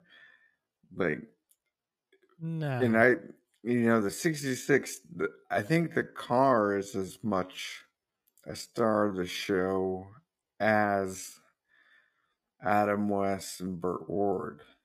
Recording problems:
wrong speed, natural pitch; too slow; 0.6 times normal speed

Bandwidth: 15 kHz